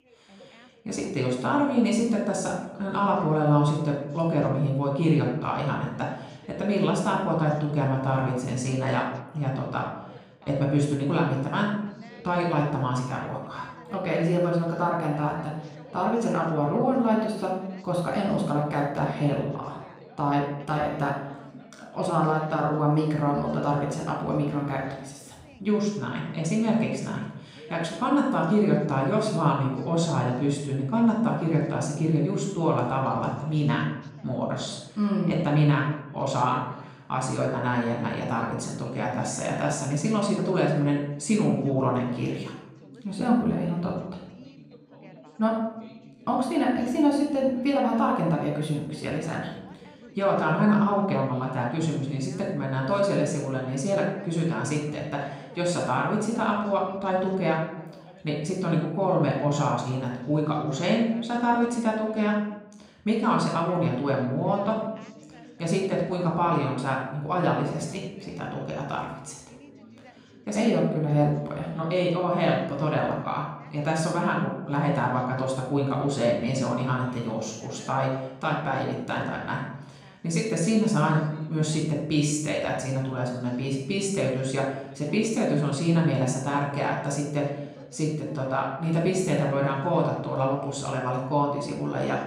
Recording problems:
off-mic speech; far
room echo; noticeable; dies away in 0.7 s
background chatter; faint; throughout; 3 voices, 25 dB below the speech

